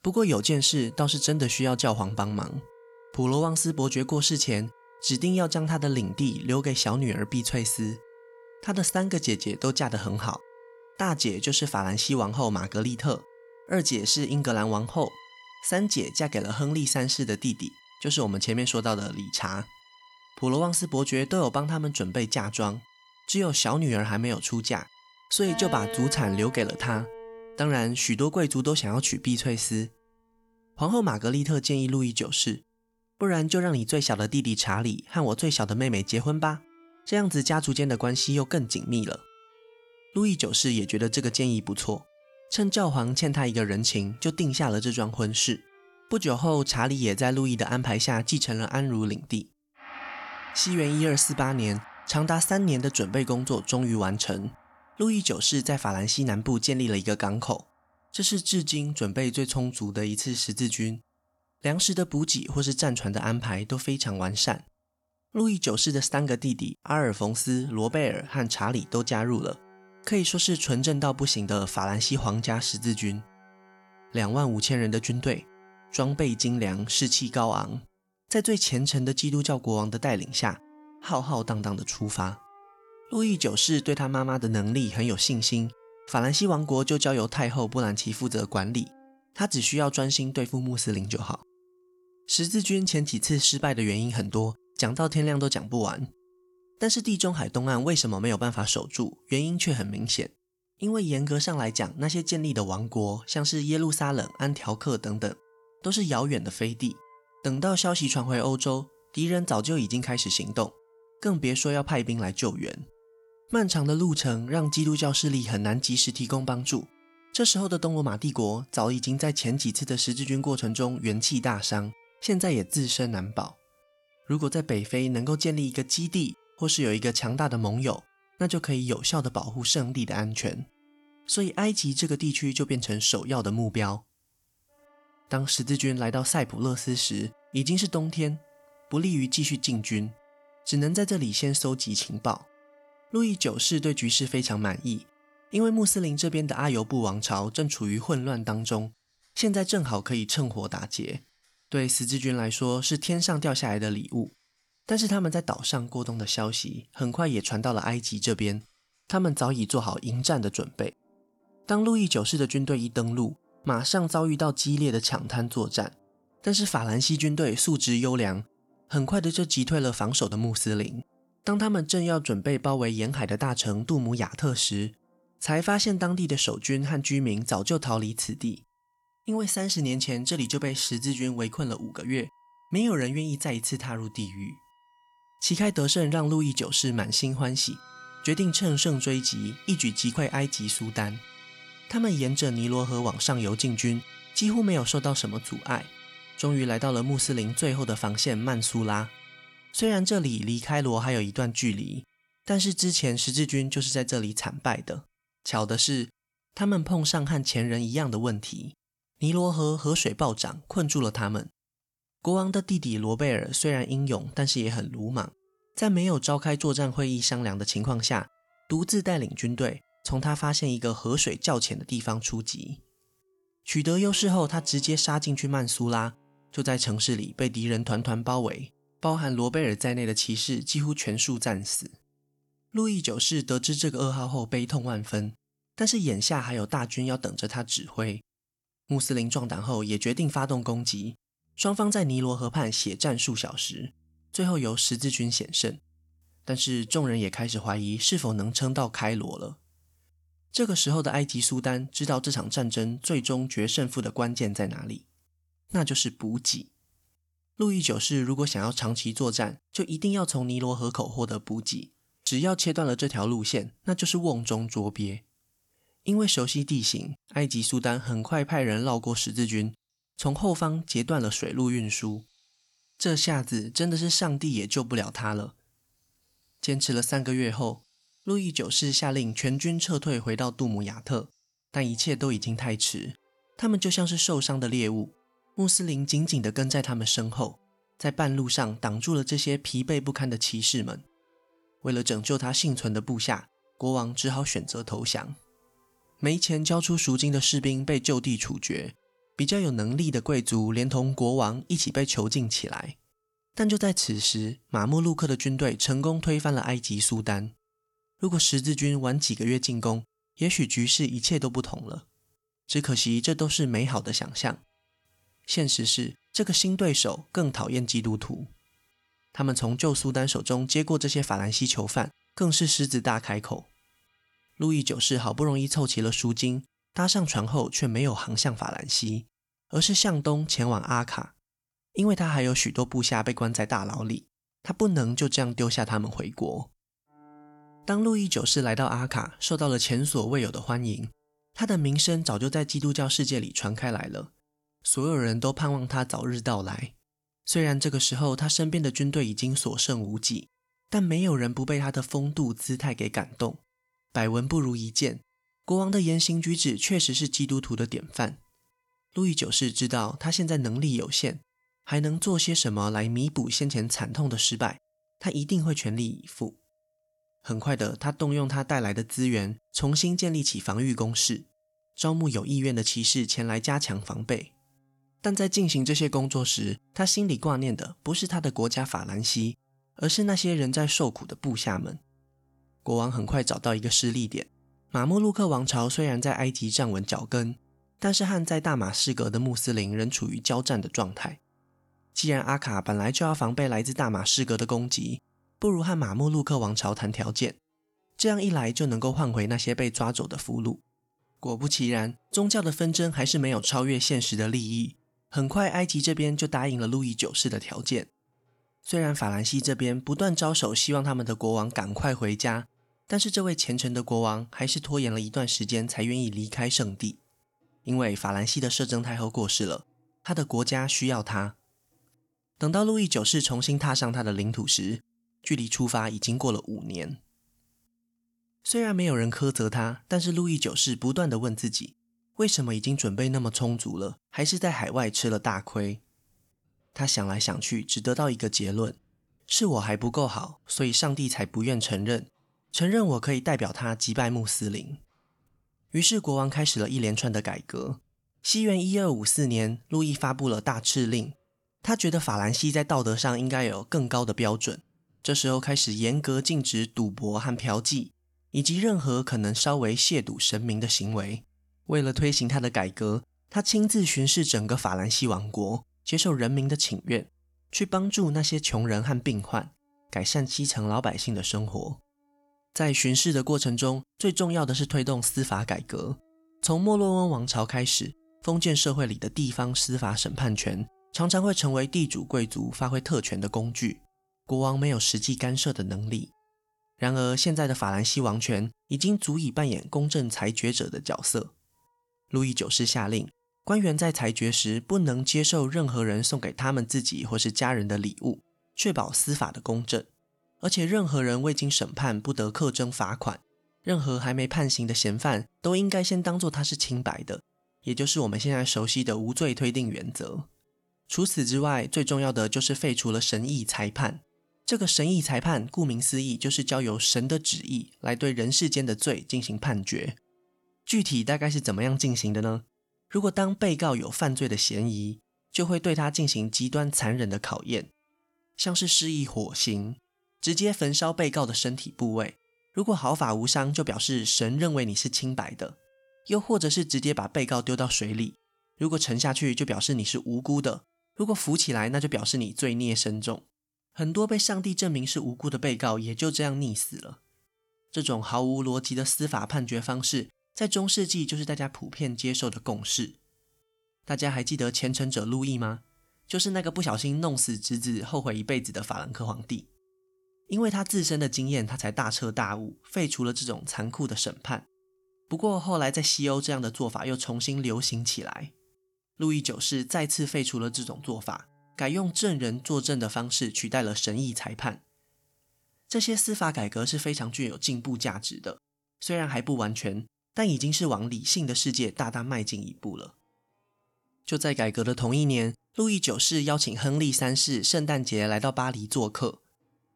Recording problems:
background music; faint; throughout; 25 dB below the speech

